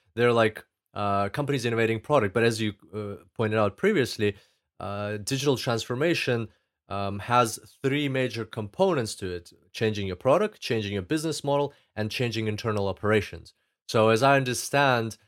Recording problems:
none

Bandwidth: 16 kHz